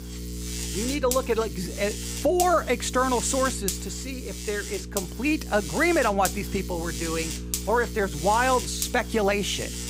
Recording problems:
electrical hum; noticeable; throughout; 60 Hz, 10 dB below the speech

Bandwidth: 15.5 kHz